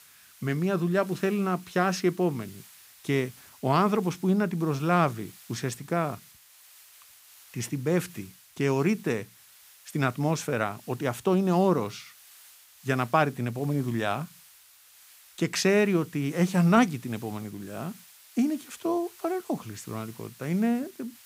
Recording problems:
hiss; faint; throughout; 25 dB below the speech

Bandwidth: 15.5 kHz